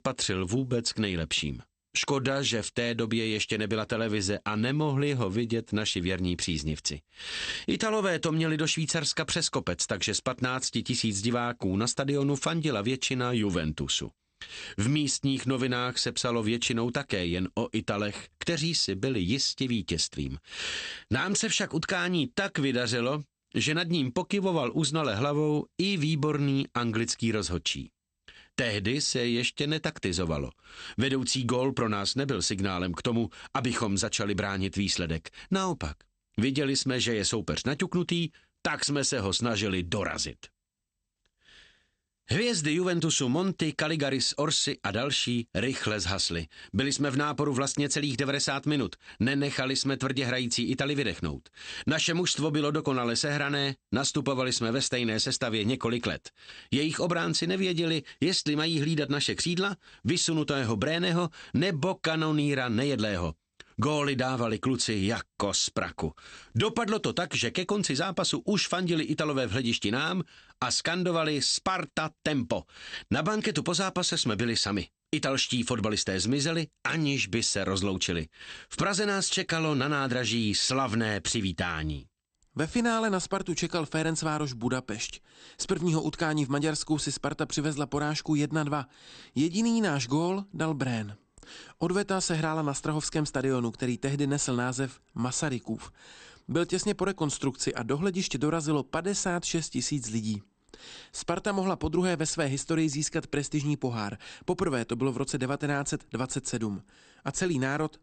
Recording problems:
garbled, watery; slightly; nothing above 8.5 kHz

